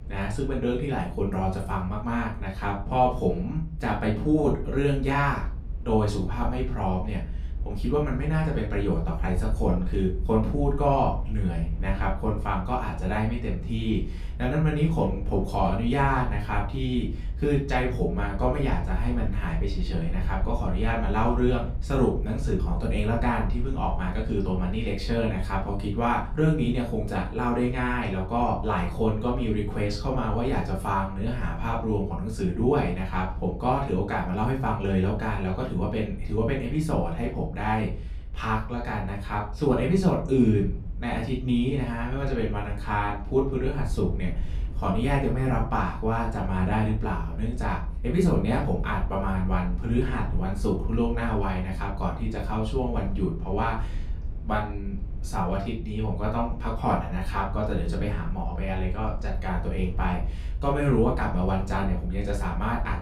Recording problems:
off-mic speech; far
room echo; slight; dies away in 0.3 s
low rumble; faint; throughout; 20 dB below the speech

